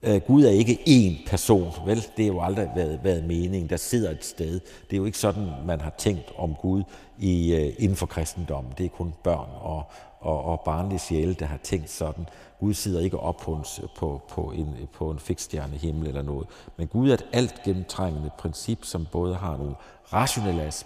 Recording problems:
echo of what is said; faint; throughout; 110 ms later, 20 dB below the speech

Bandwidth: 14.5 kHz